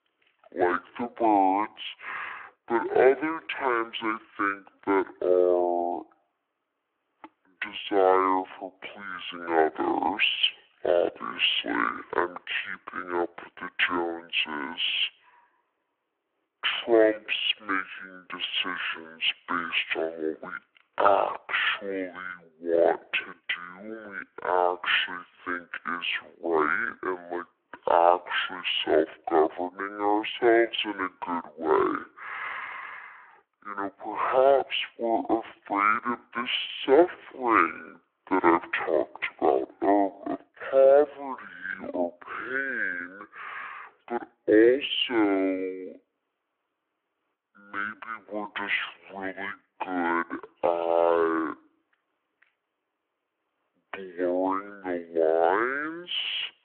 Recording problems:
wrong speed and pitch; too slow and too low; 0.5 times normal speed
phone-call audio; nothing above 3.5 kHz

